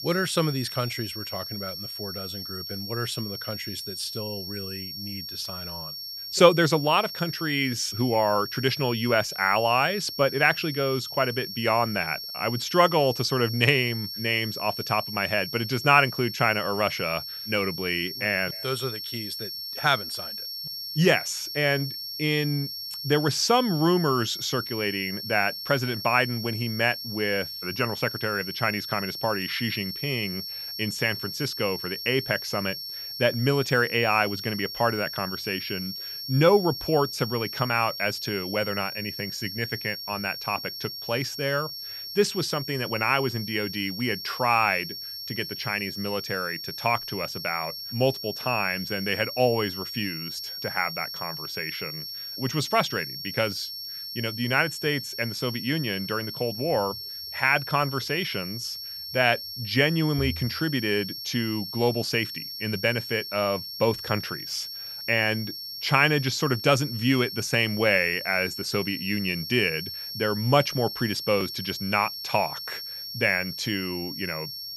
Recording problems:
high-pitched whine; loud; throughout; 5.5 kHz, 7 dB below the speech

